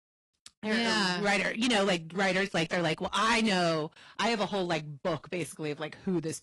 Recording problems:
distortion; heavy; 11% of the sound clipped
garbled, watery; slightly; nothing above 11 kHz

